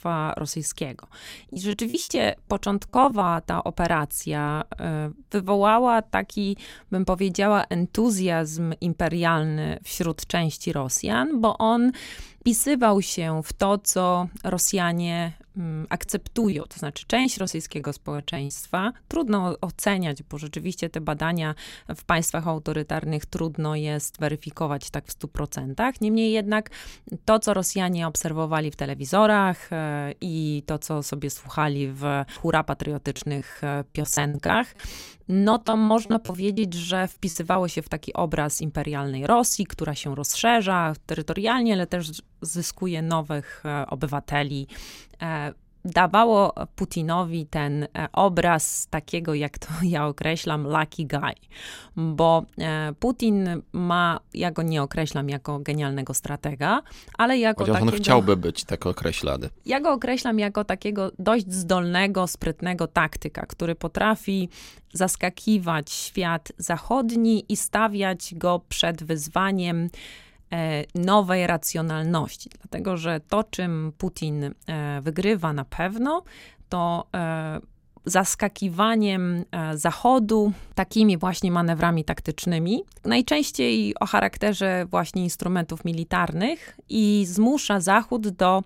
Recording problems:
choppy; very; from 1.5 to 3.5 s, from 15 to 19 s and from 33 to 38 s; 16% of the speech affected

